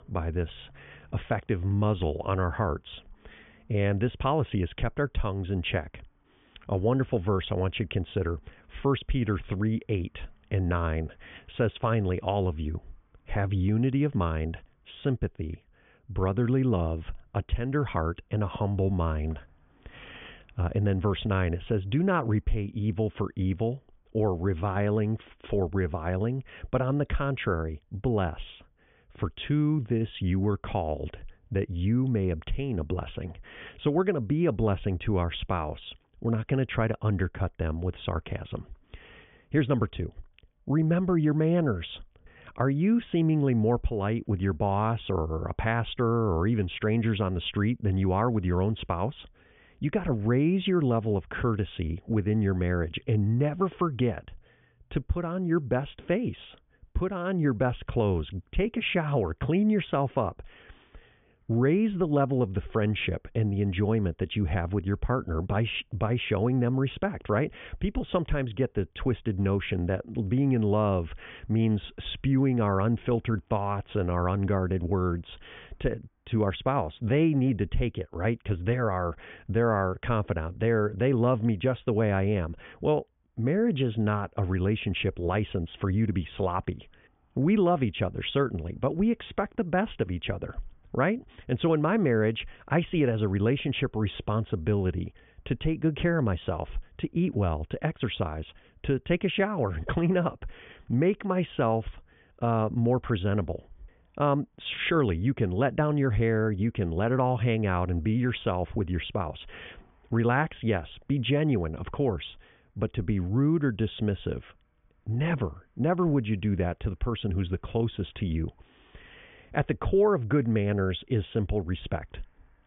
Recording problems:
high frequencies cut off; severe; nothing above 3.5 kHz

